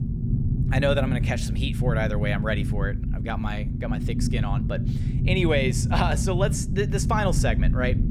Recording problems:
low rumble; loud; throughout; 9 dB below the speech

